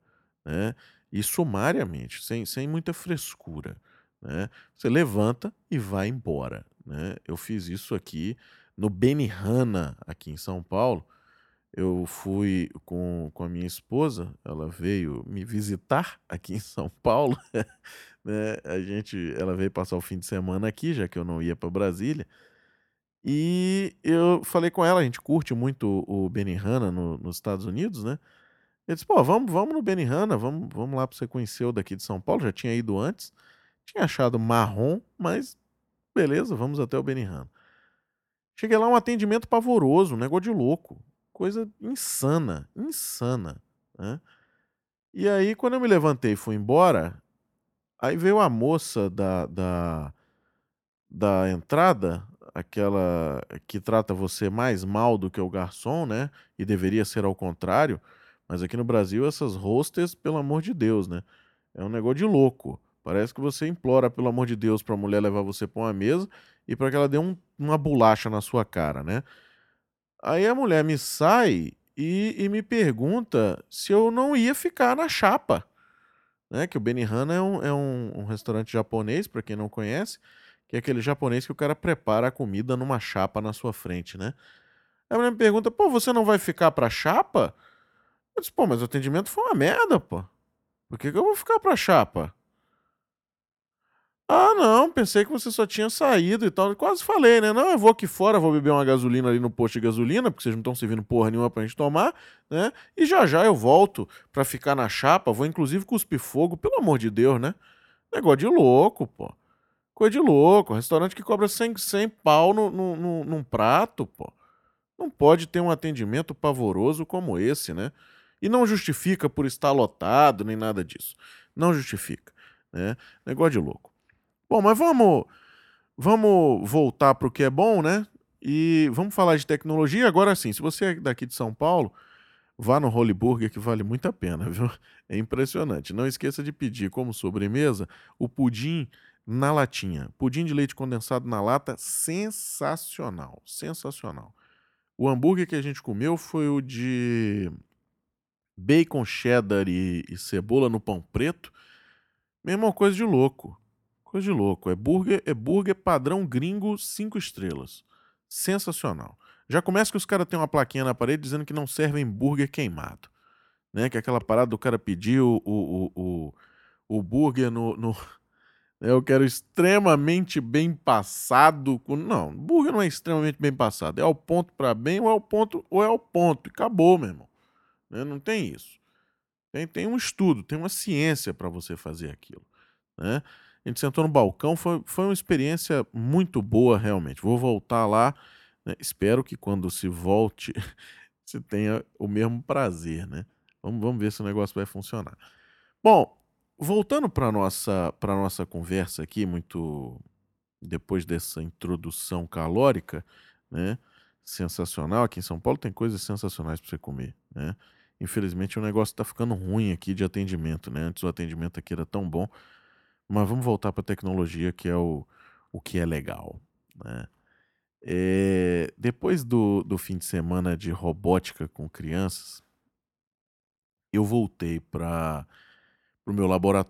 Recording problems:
none

